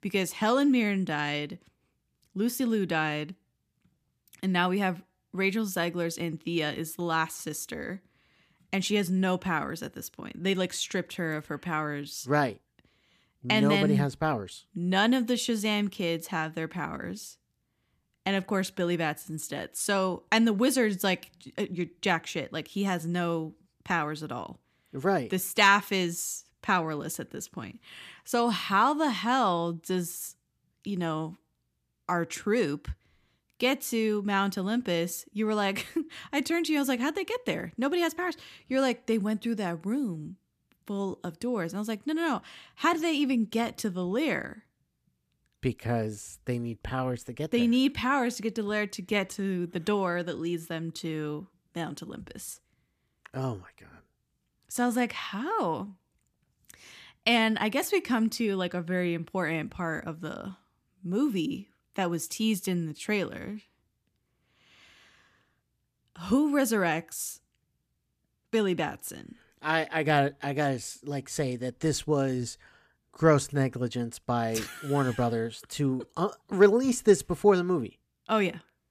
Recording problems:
none

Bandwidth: 14.5 kHz